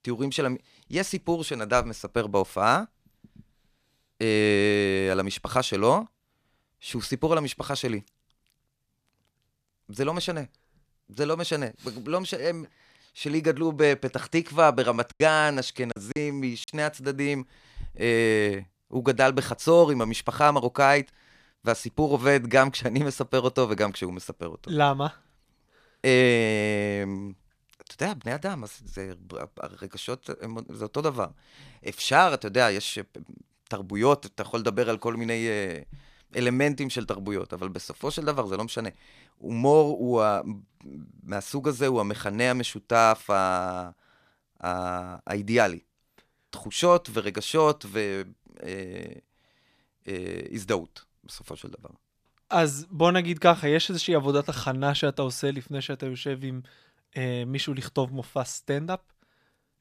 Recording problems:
choppy; very; from 15 to 17 s; 12% of the speech affected

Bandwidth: 14.5 kHz